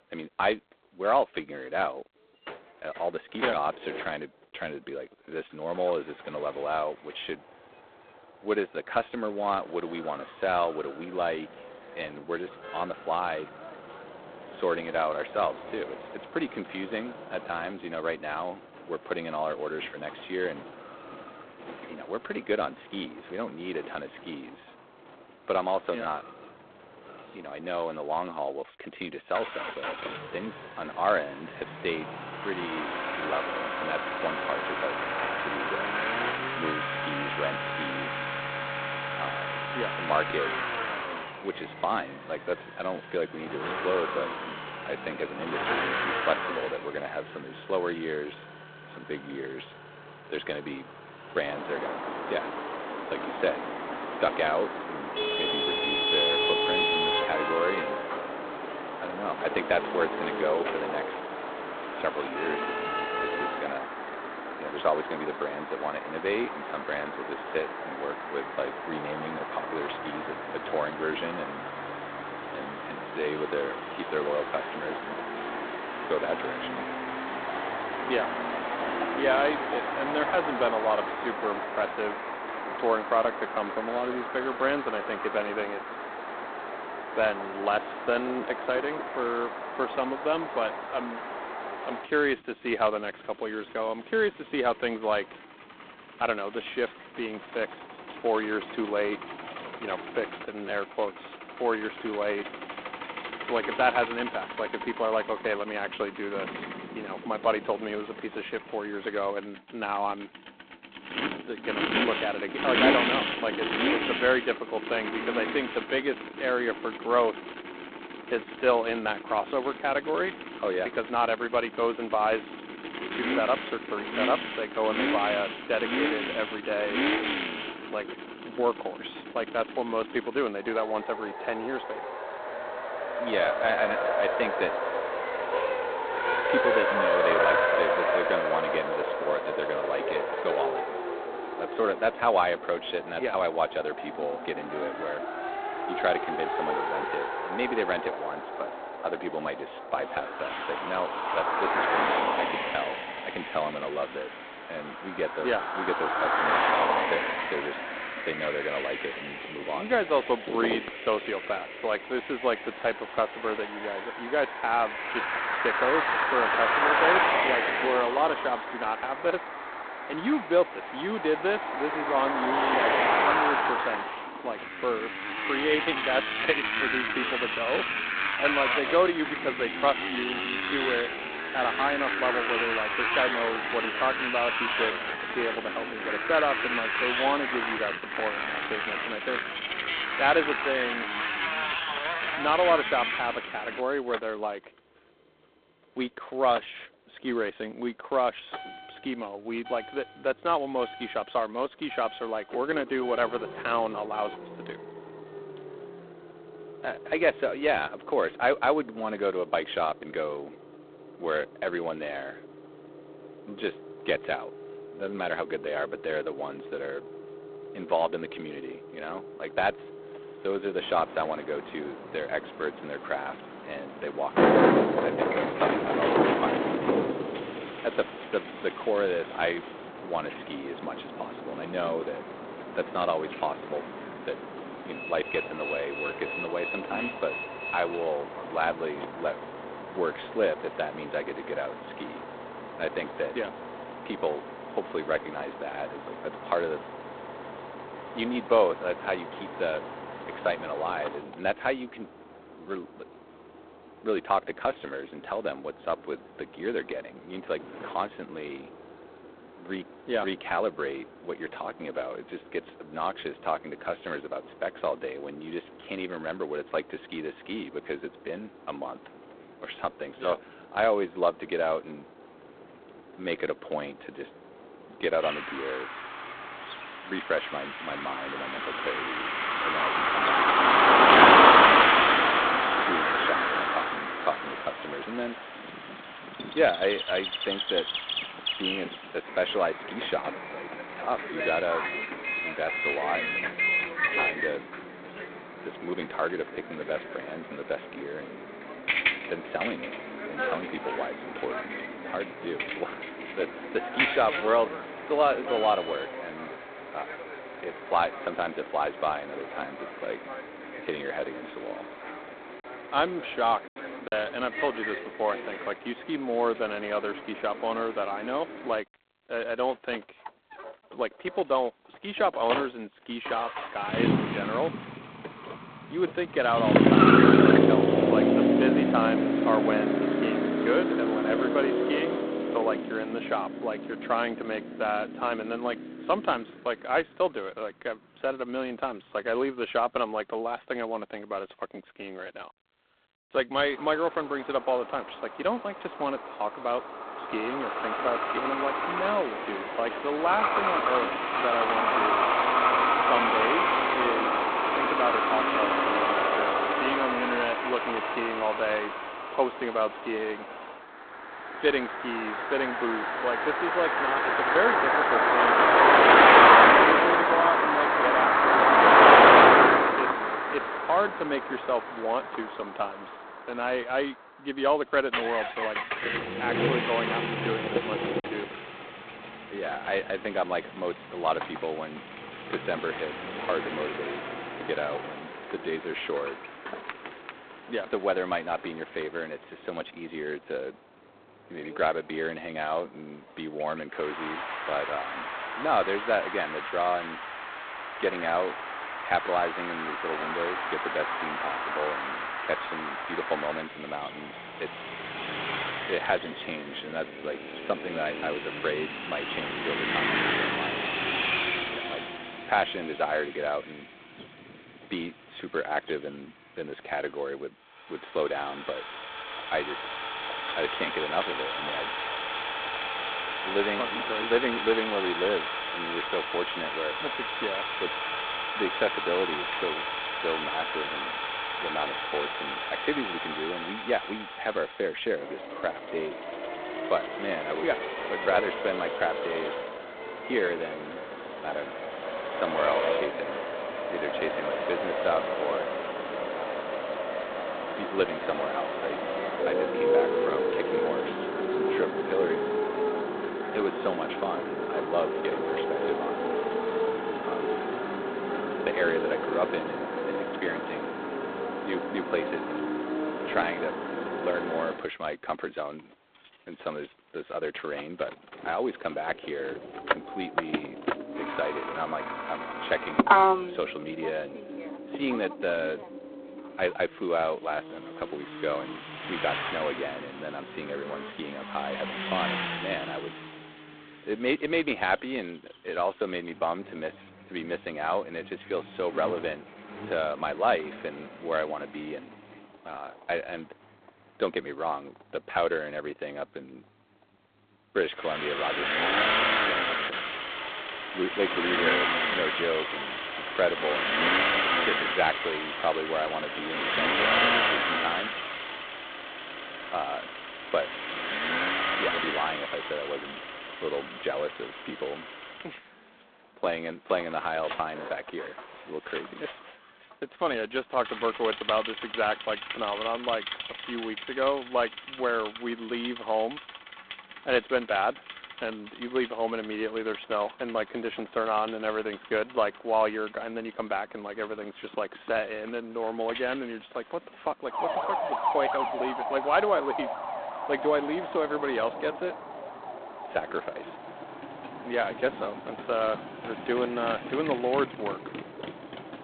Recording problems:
phone-call audio; poor line; nothing above 4 kHz
traffic noise; very loud; throughout; 3 dB above the speech
choppy; occasionally; at 5:14 and at 6:18; 2% of the speech affected

